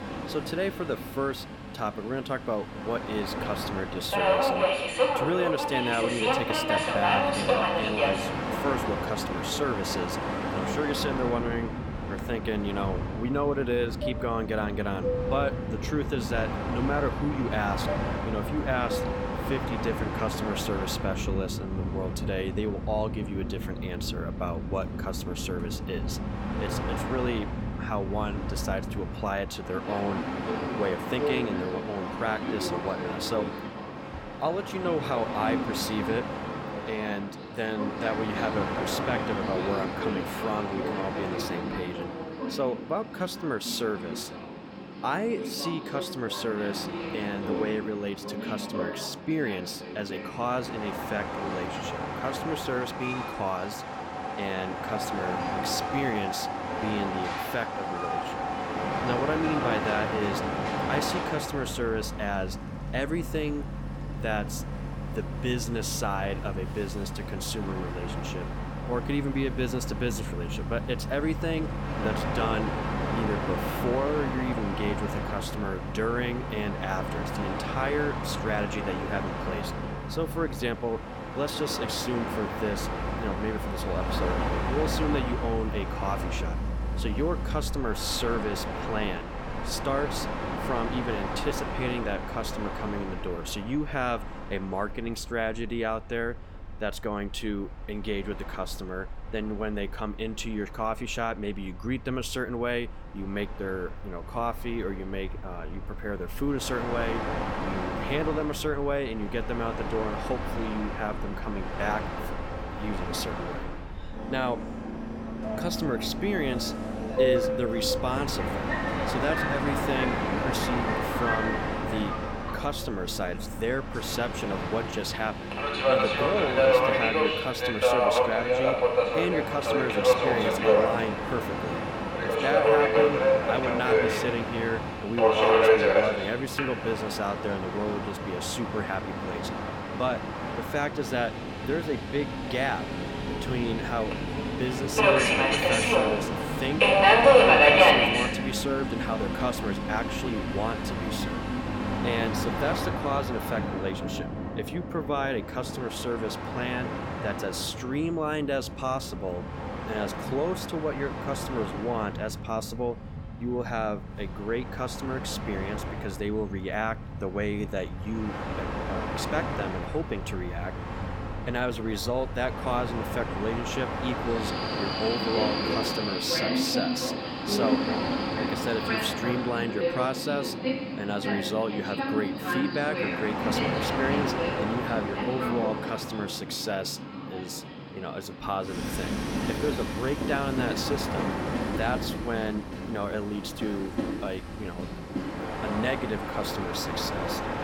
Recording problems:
train or aircraft noise; very loud; throughout; 2 dB above the speech

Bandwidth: 18 kHz